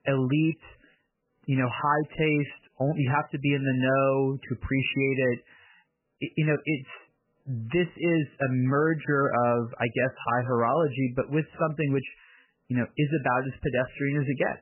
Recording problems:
garbled, watery; badly; nothing above 3 kHz

